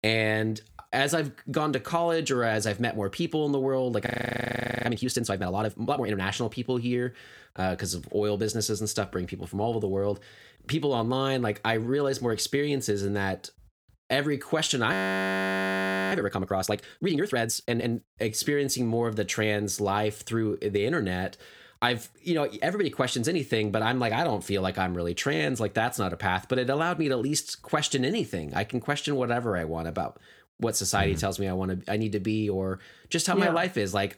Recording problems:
audio freezing; at 4 s for 1 s and at 15 s for 1 s

